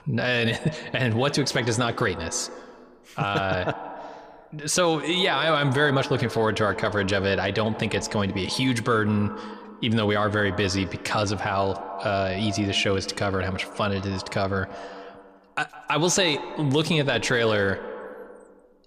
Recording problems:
echo of what is said; noticeable; throughout; 160 ms later, 15 dB below the speech

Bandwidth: 15 kHz